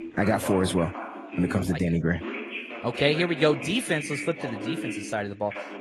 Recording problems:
garbled, watery; slightly; nothing above 12 kHz
voice in the background; loud; throughout; 9 dB below the speech

